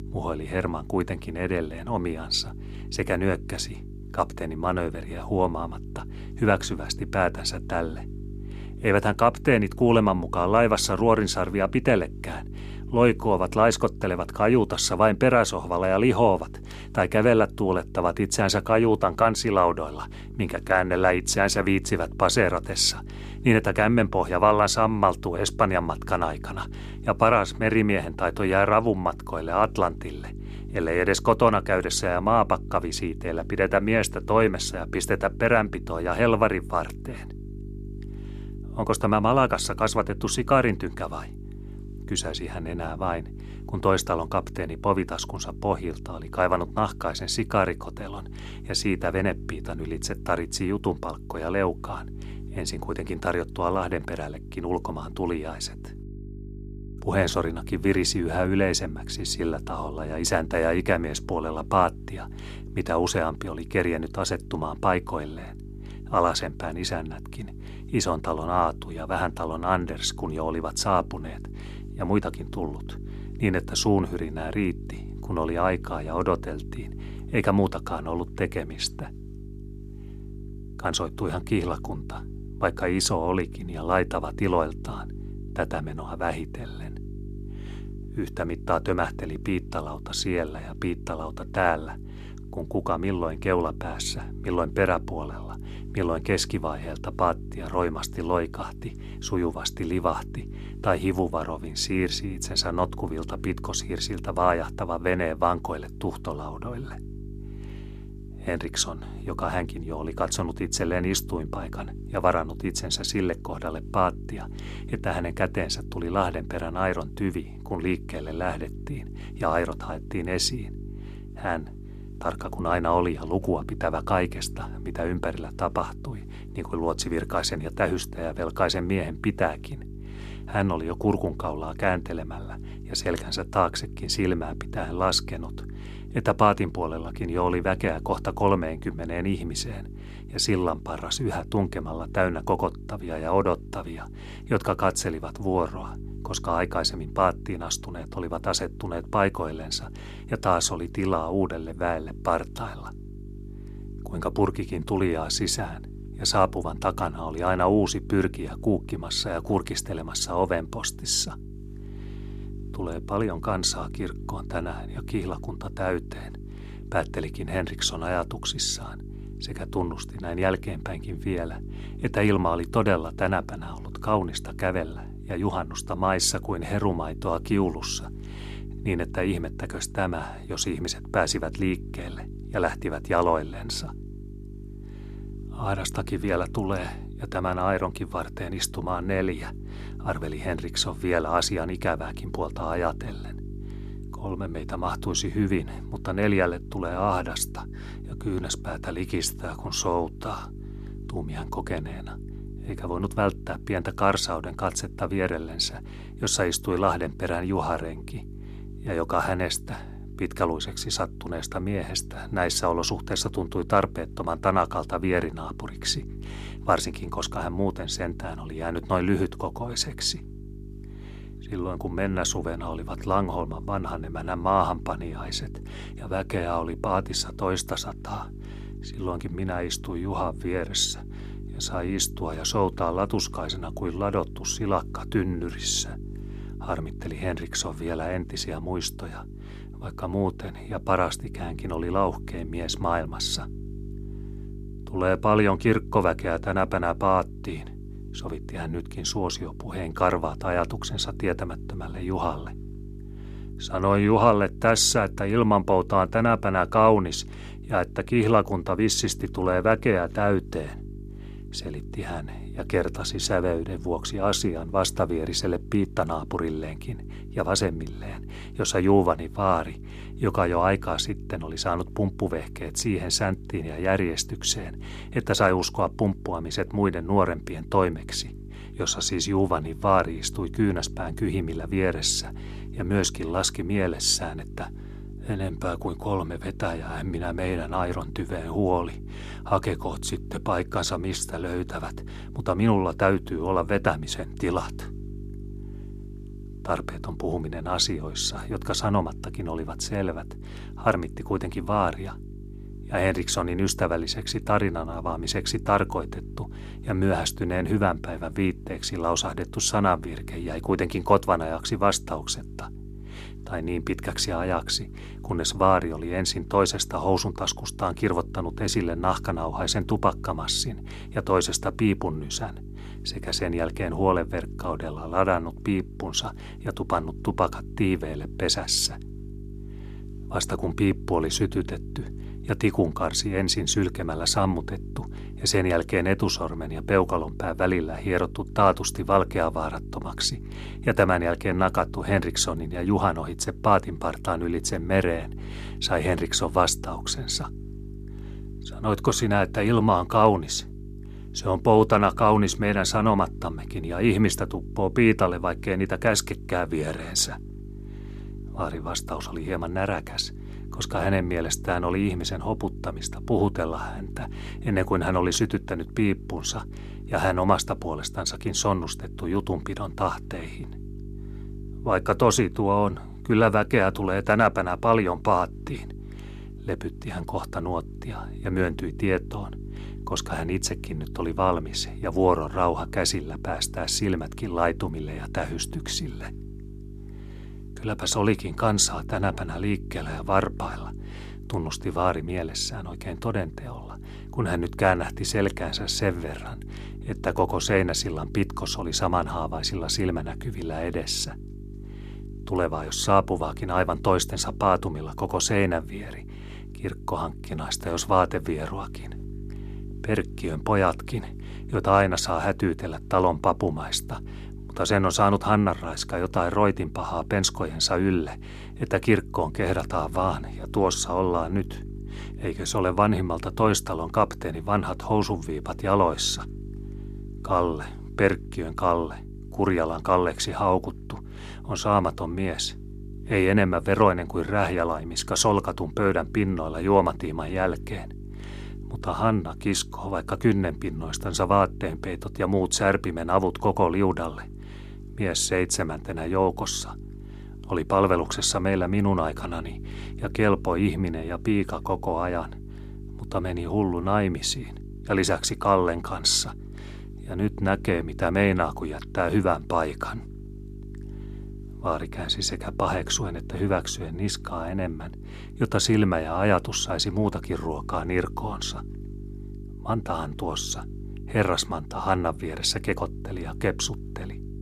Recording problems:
electrical hum; faint; throughout; 50 Hz, 20 dB below the speech

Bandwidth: 14 kHz